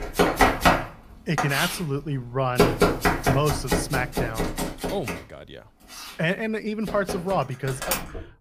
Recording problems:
household noises; very loud; throughout; 3 dB above the speech

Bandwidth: 15 kHz